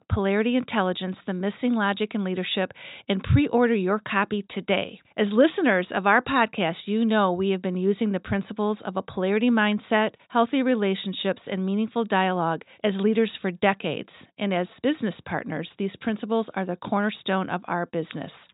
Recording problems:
high frequencies cut off; severe; nothing above 4 kHz

